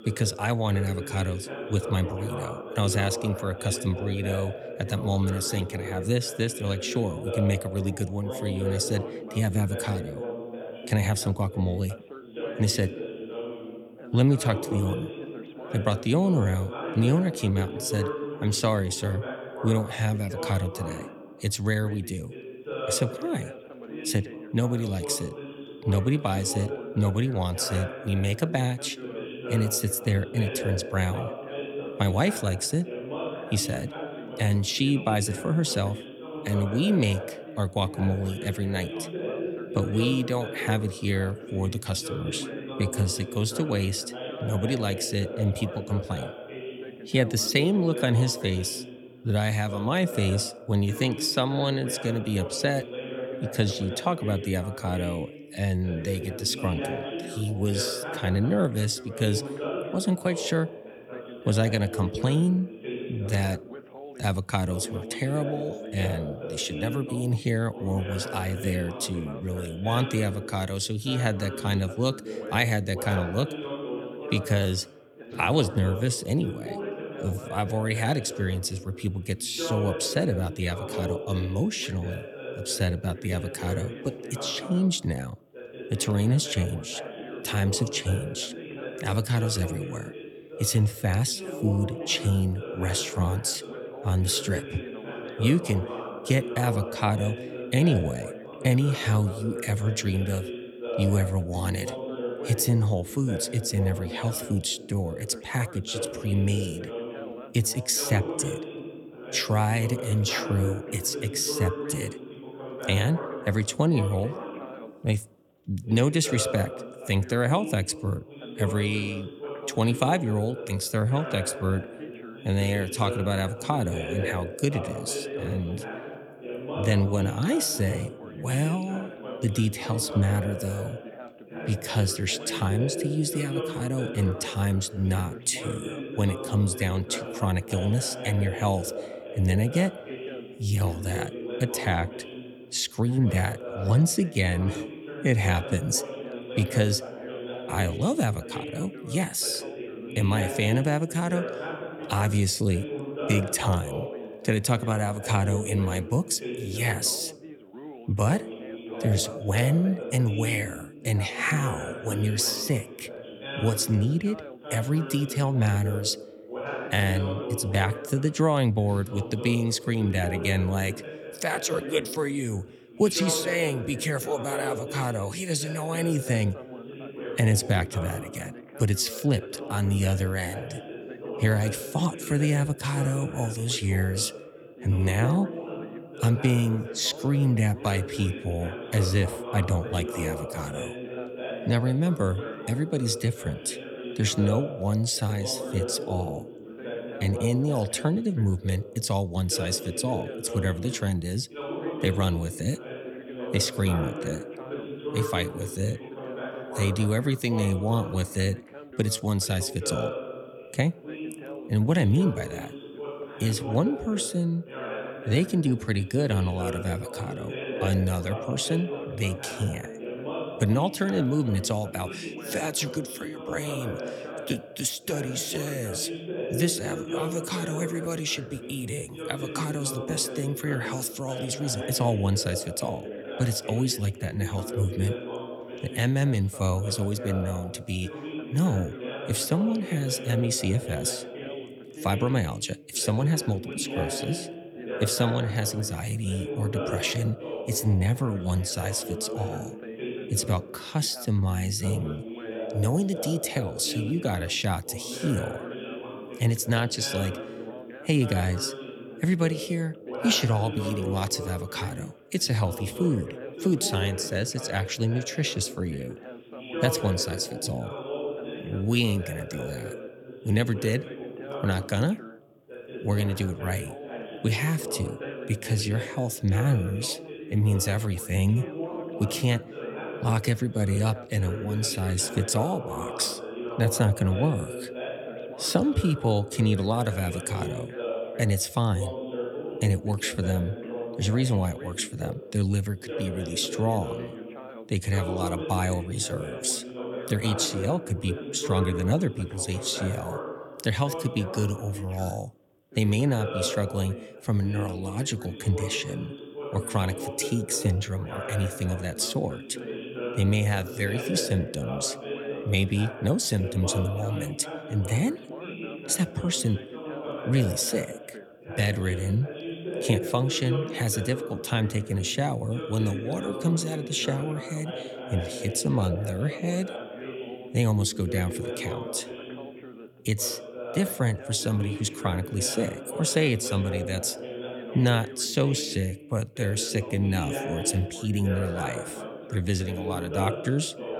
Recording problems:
background chatter; loud; throughout; 2 voices, 9 dB below the speech

